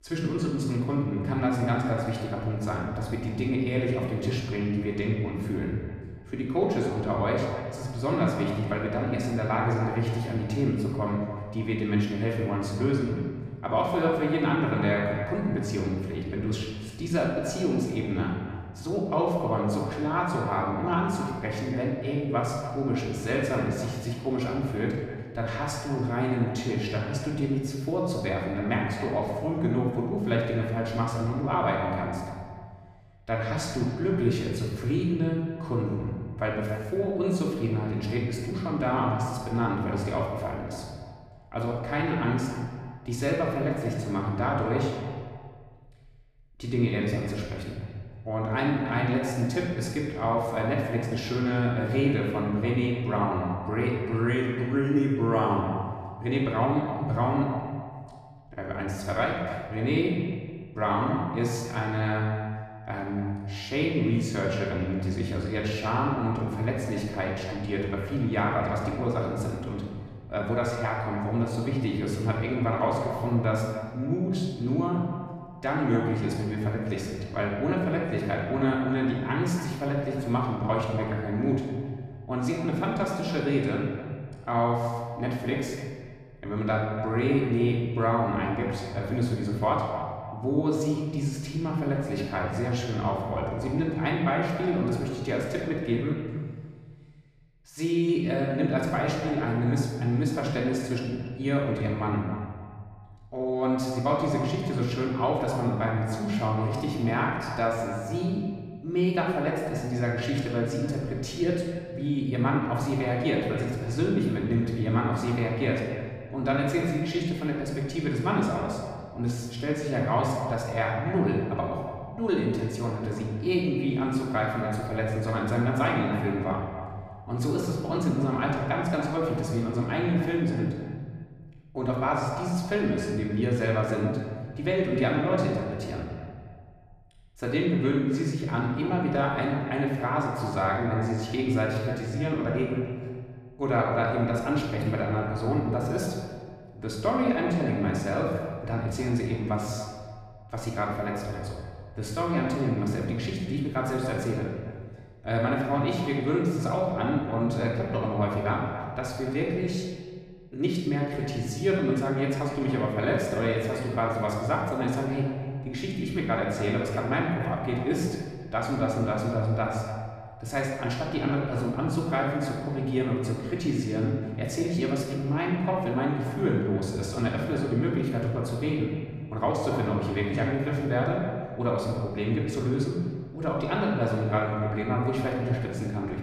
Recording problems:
off-mic speech; far
echo of what is said; noticeable; throughout; 290 ms later, 15 dB below the speech
room echo; noticeable; dies away in 1.3 s

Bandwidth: 15 kHz